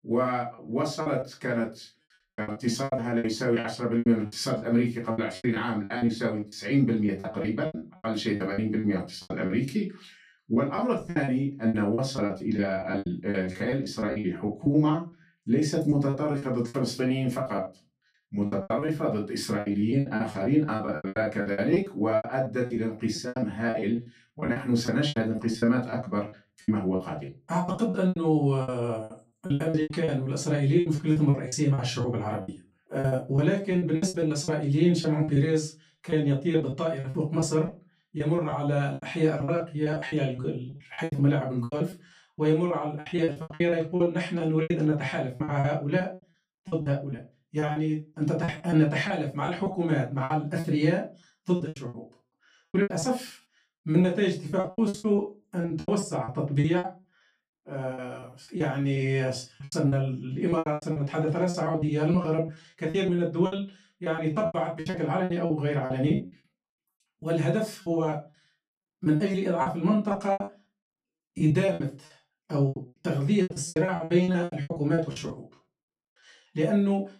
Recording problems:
off-mic speech; far
room echo; slight; dies away in 0.2 s
choppy; very; 18% of the speech affected

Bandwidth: 15 kHz